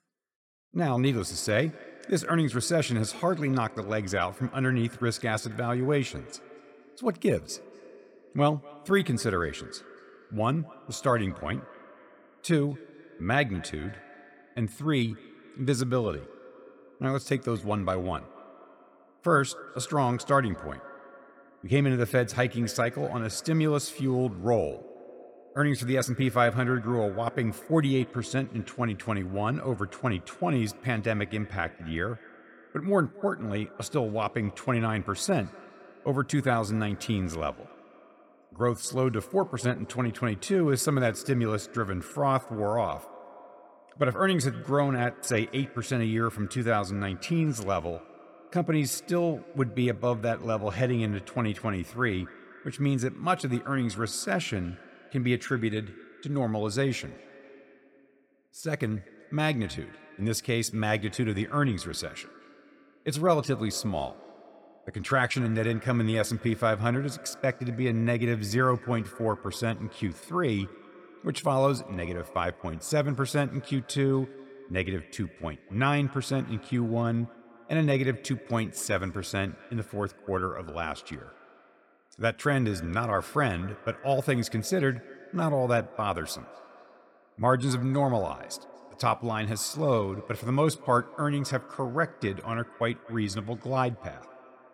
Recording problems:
echo of what is said; faint; throughout; 240 ms later, 20 dB below the speech

